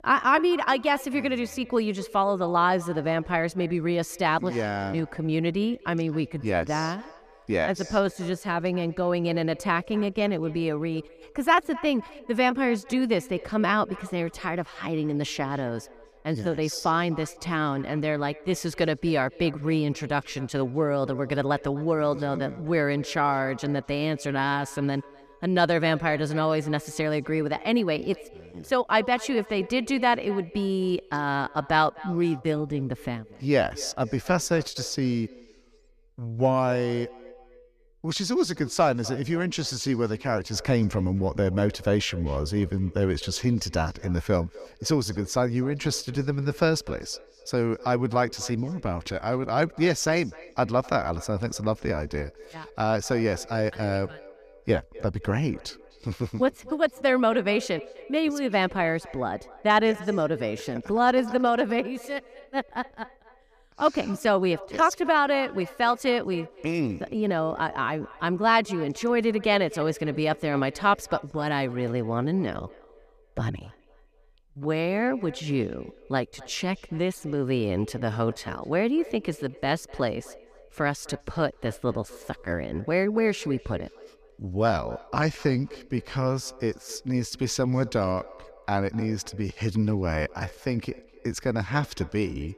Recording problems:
echo of what is said; faint; throughout; 250 ms later, 20 dB below the speech

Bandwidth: 14.5 kHz